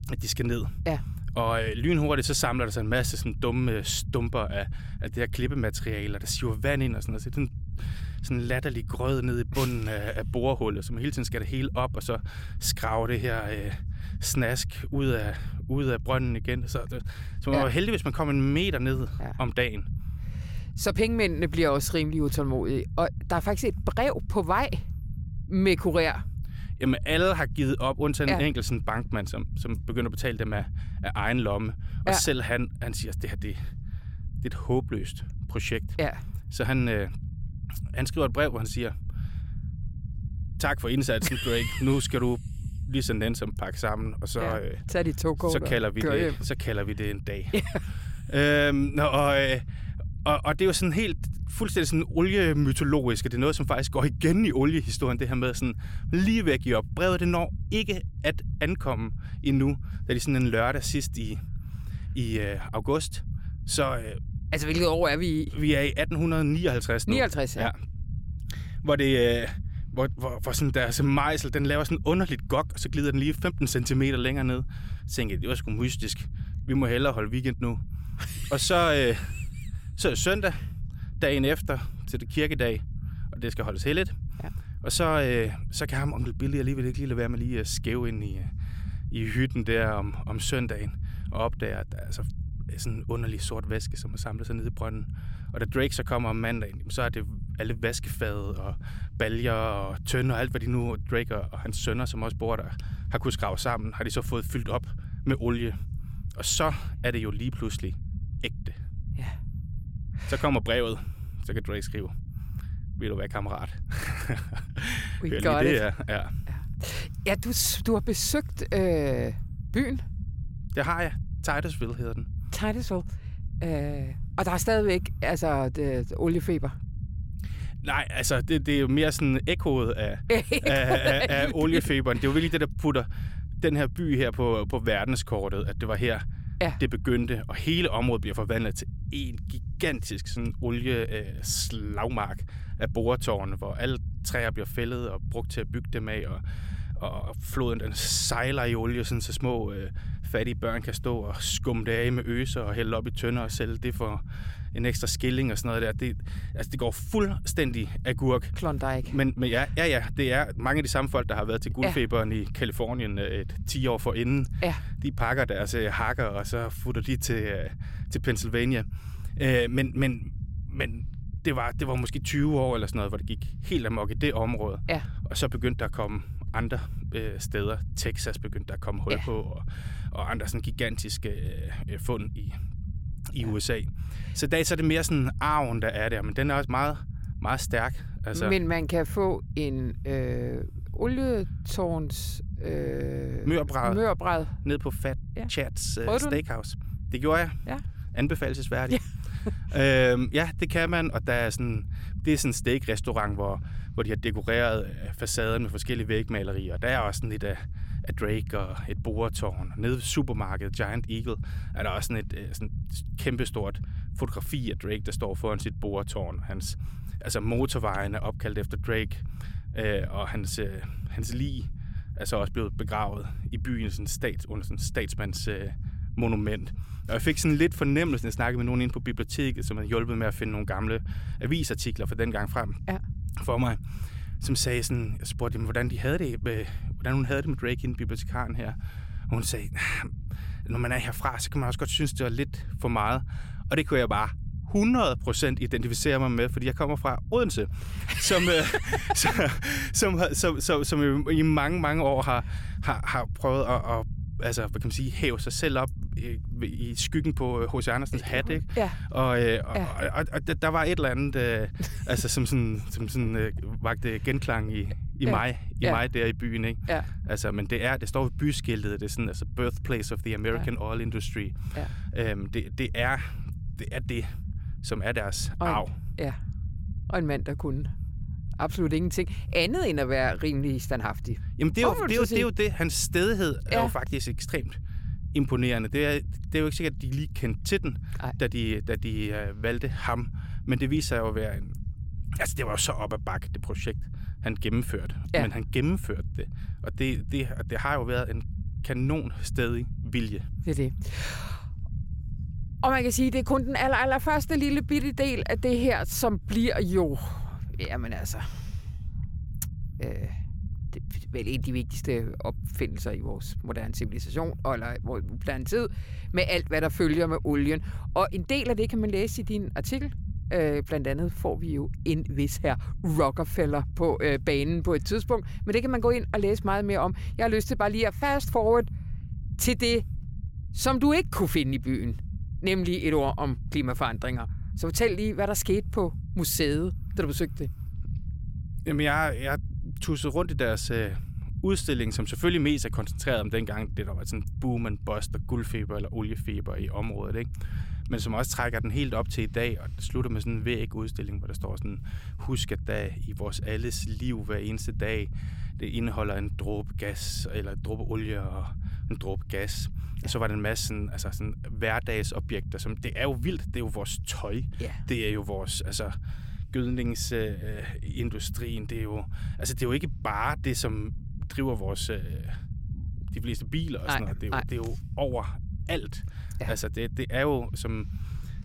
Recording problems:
low rumble; faint; throughout; 20 dB below the speech

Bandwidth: 16.5 kHz